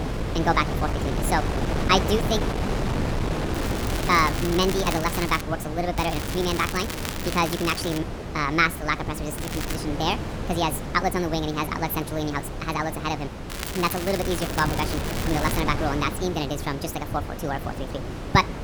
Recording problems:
wrong speed and pitch; too fast and too high; 1.5 times normal speed
wind noise on the microphone; heavy; 8 dB below the speech
crackling; loud; 4 times, first at 3.5 s; 8 dB below the speech

